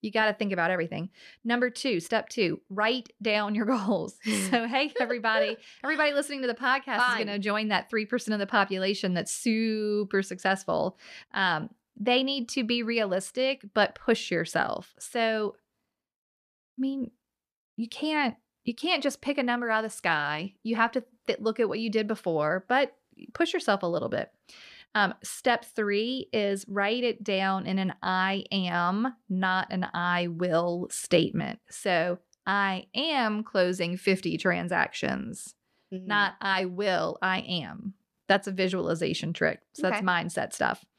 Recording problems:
none

